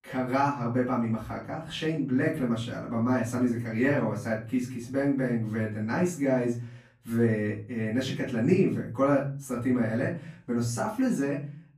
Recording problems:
off-mic speech; far
room echo; slight; dies away in 0.5 s

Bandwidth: 14.5 kHz